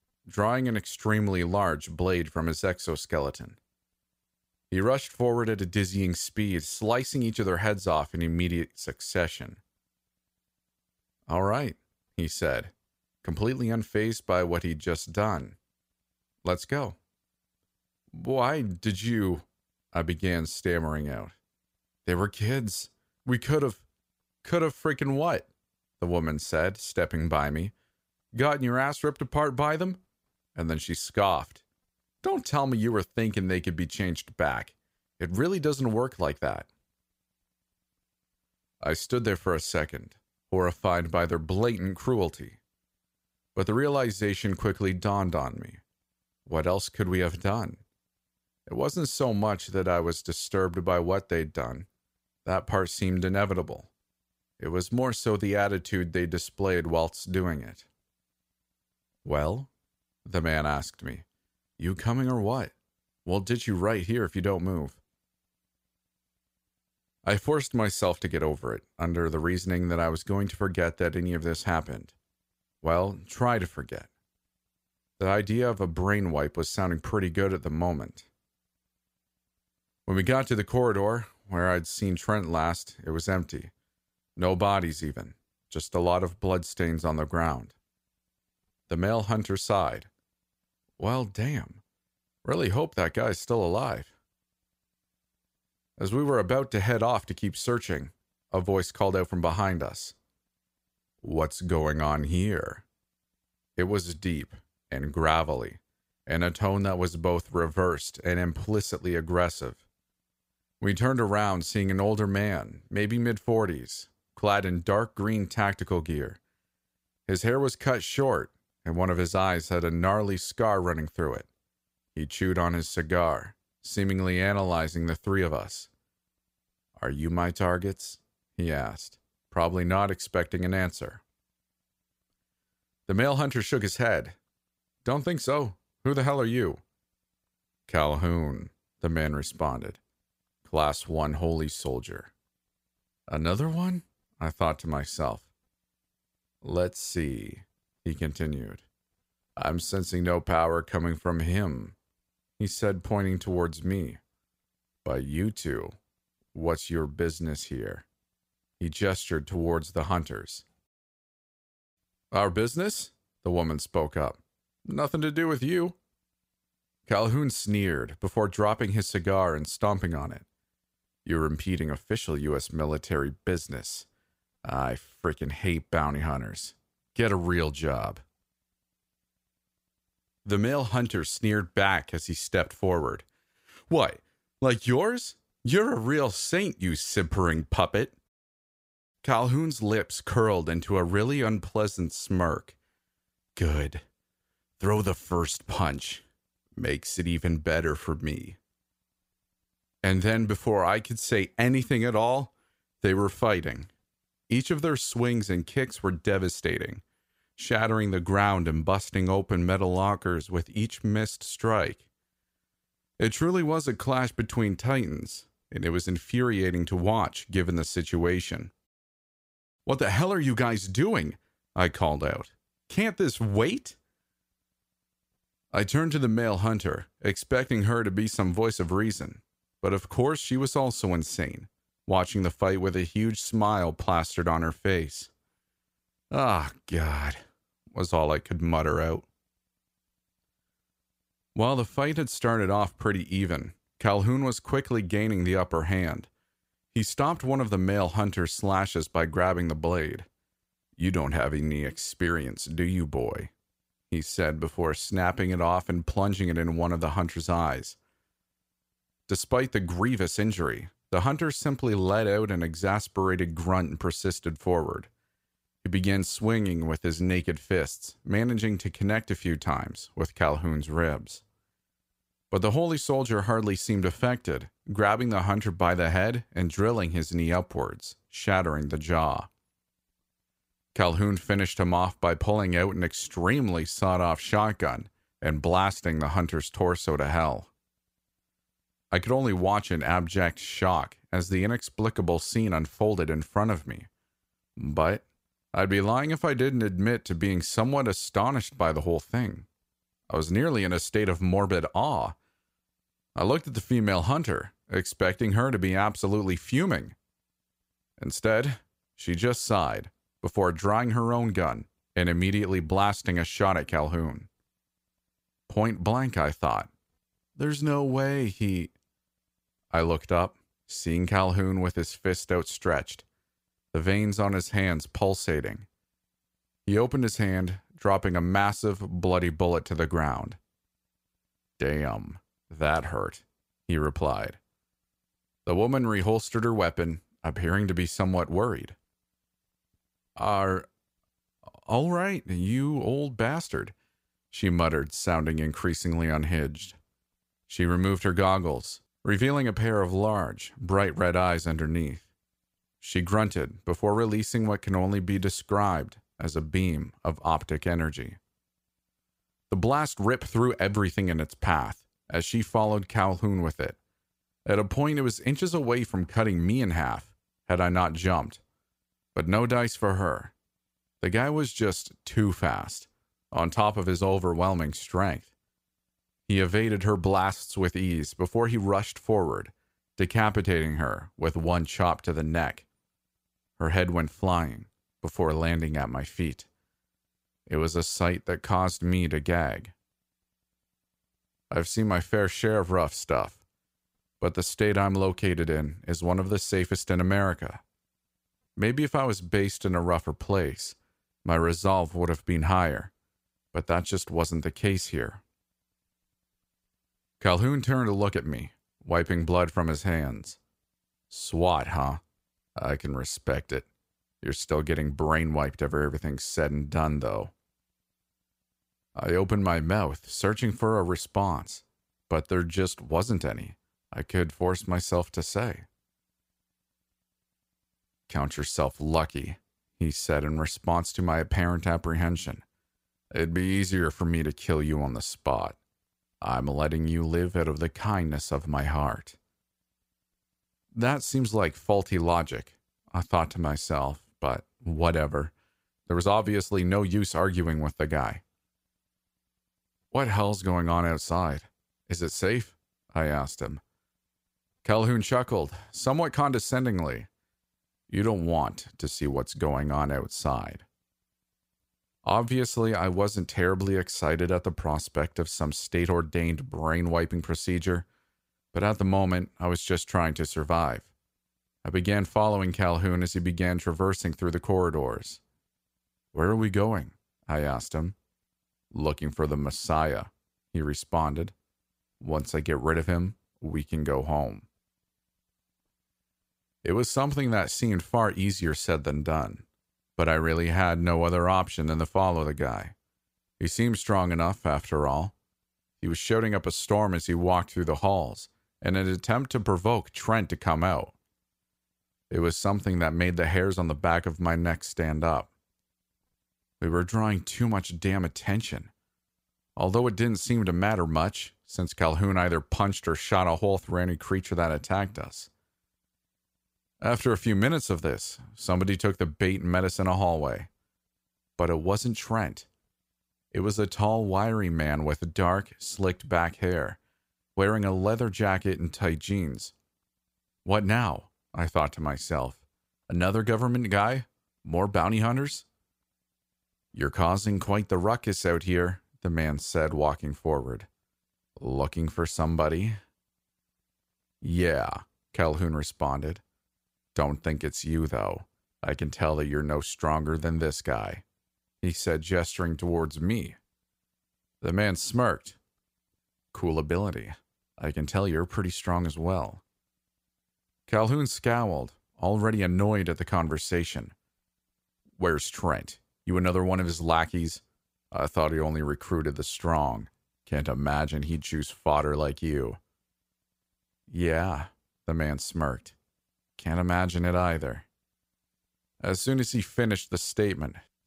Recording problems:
none

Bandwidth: 15.5 kHz